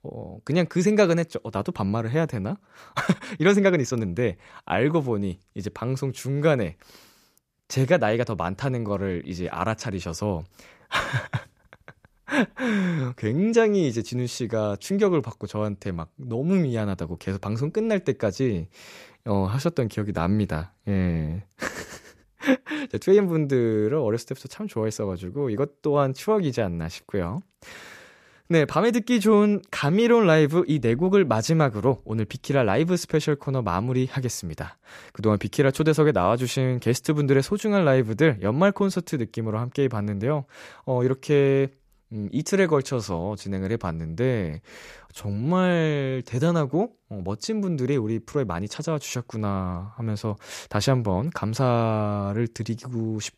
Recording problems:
uneven, jittery; strongly; from 3 to 51 s

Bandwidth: 14.5 kHz